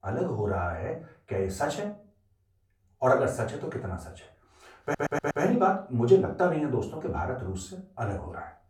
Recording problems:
off-mic speech; far
room echo; slight; dies away in 0.3 s
audio stuttering; at 5 s

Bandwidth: 17.5 kHz